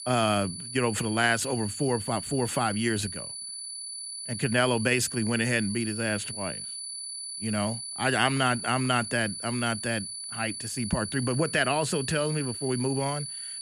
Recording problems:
high-pitched whine; loud; throughout; 10 kHz, 7 dB below the speech

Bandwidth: 15 kHz